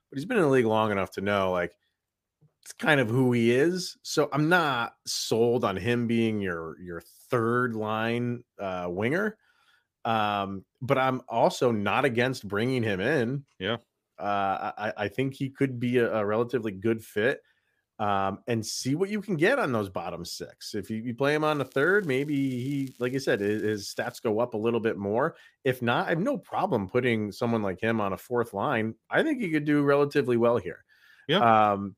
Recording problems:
crackling; faint; from 22 to 24 s; 30 dB below the speech

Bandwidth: 15 kHz